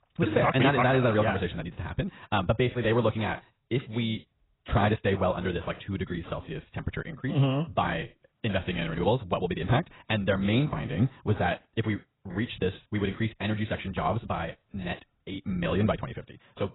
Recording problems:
garbled, watery; badly; nothing above 4 kHz
wrong speed, natural pitch; too fast; 1.6 times normal speed

